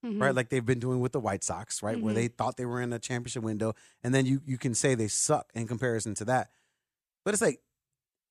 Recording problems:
none

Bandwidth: 14.5 kHz